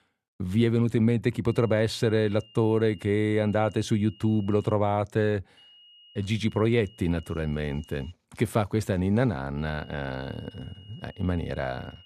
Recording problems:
high-pitched whine; faint; from 1.5 to 4.5 s, from 5.5 to 8 s and from 9.5 s on; 3 kHz, 25 dB below the speech

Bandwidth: 14 kHz